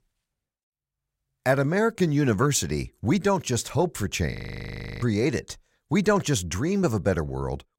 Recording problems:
audio freezing; at 4.5 s for 0.5 s

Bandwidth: 16 kHz